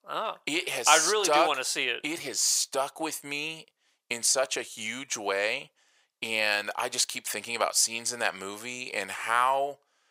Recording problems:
thin; very; fading below 700 Hz

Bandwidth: 15.5 kHz